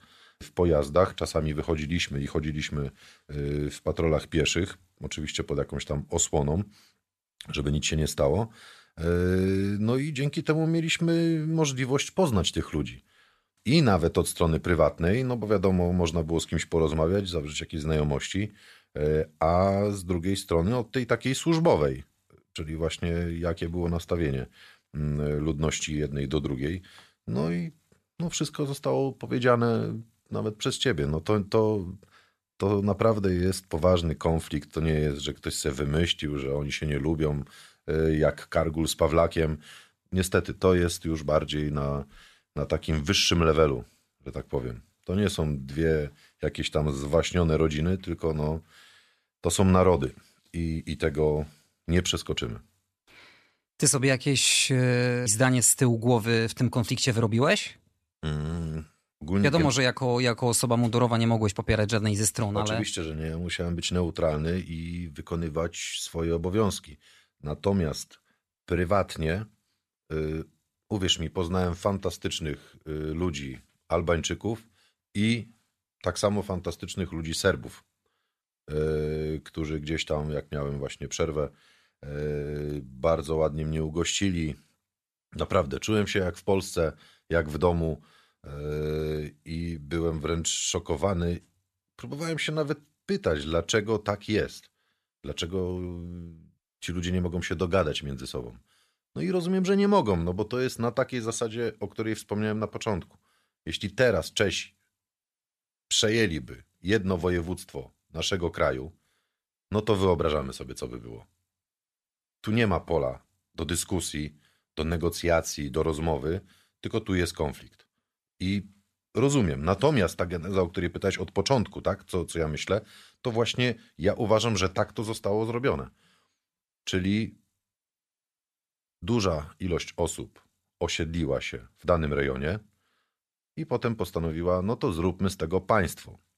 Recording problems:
none

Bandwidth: 14 kHz